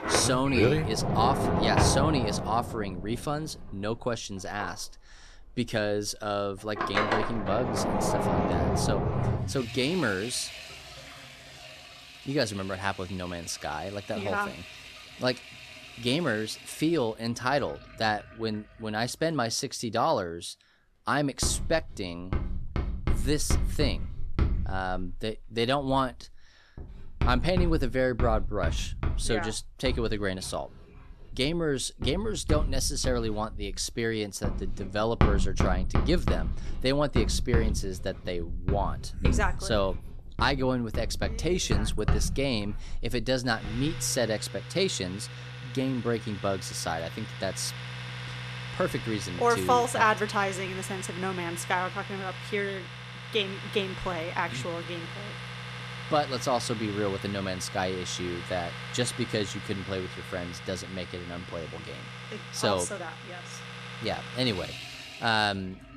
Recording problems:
household noises; loud; throughout; 4 dB below the speech

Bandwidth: 13.5 kHz